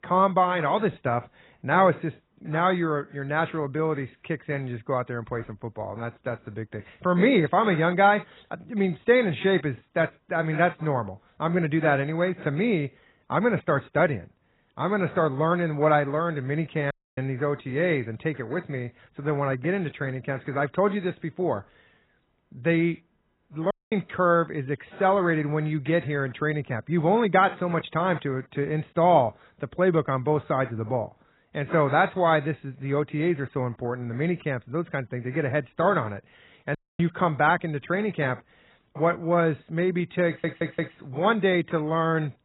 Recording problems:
garbled, watery; badly; nothing above 4 kHz
audio cutting out; at 17 s, at 24 s and at 37 s
audio stuttering; at 40 s

